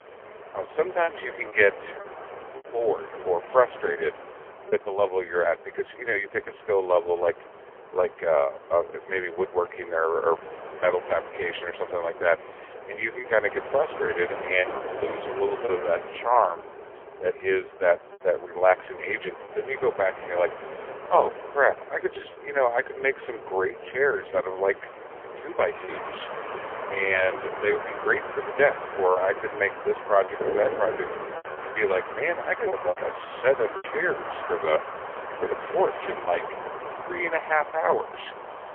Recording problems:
phone-call audio; poor line; nothing above 3.5 kHz
wind in the background; noticeable; throughout; 10 dB below the speech
choppy; occasionally; 3% of the speech affected

